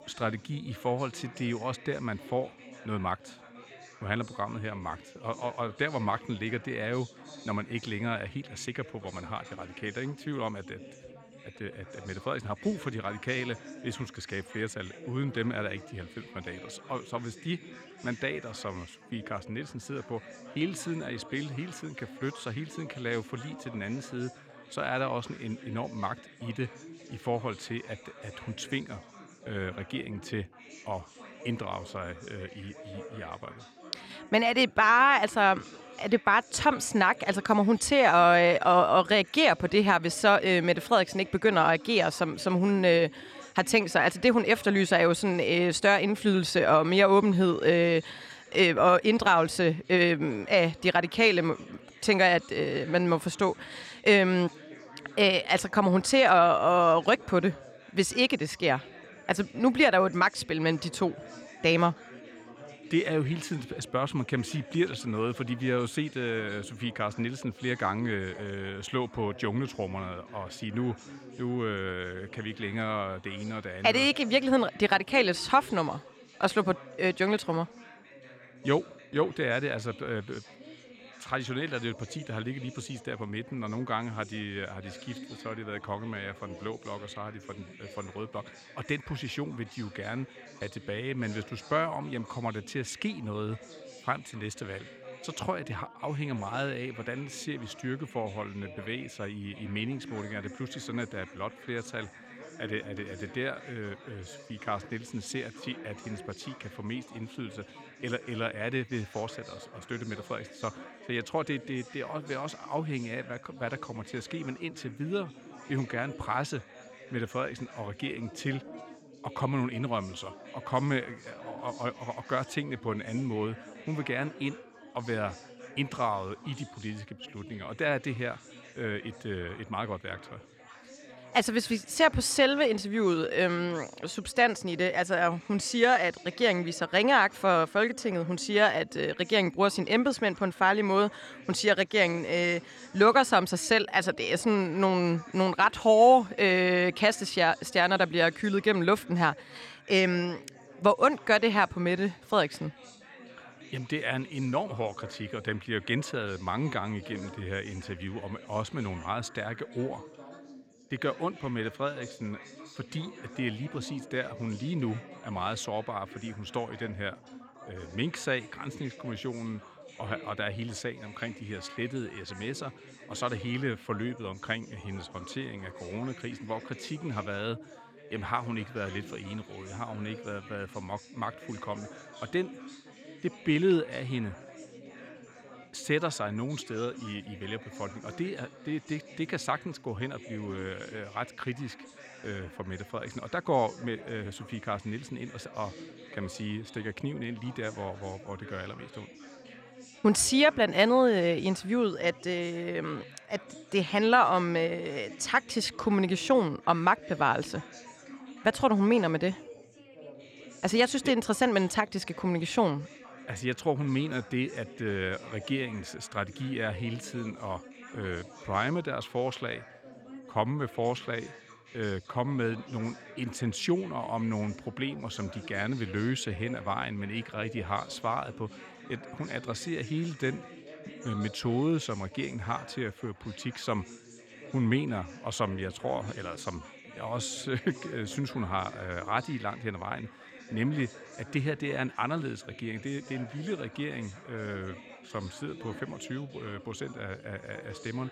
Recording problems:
chatter from many people; noticeable; throughout; 20 dB below the speech

